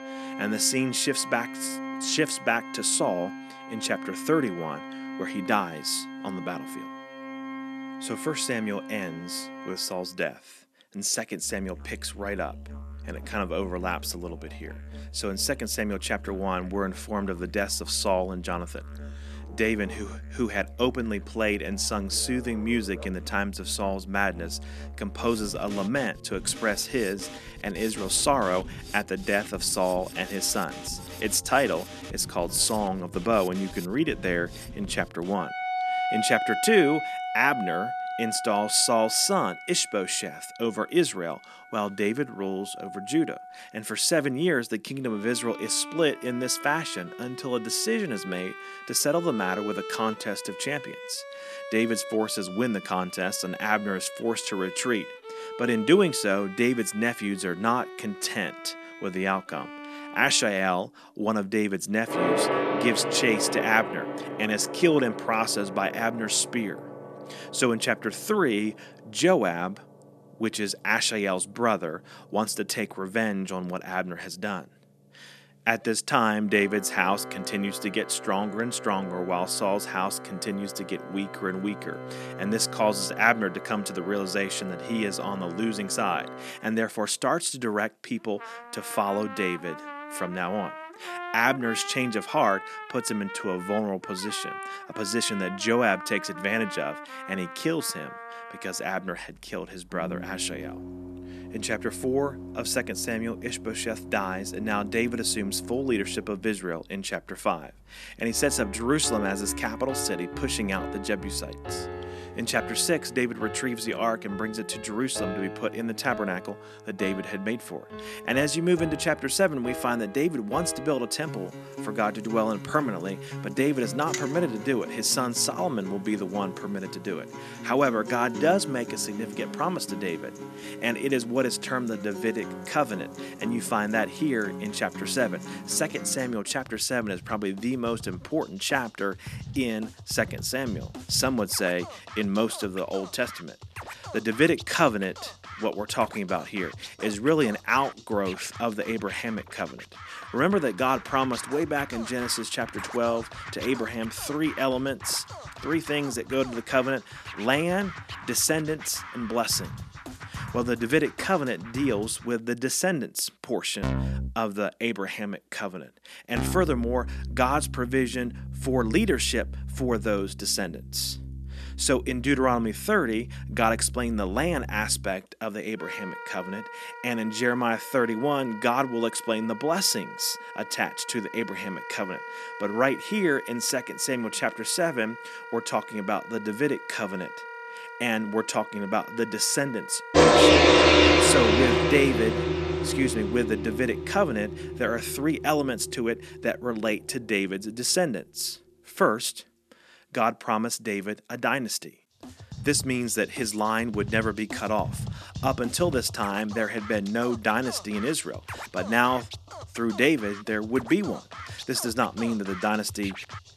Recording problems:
background music; loud; throughout; 7 dB below the speech

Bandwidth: 13.5 kHz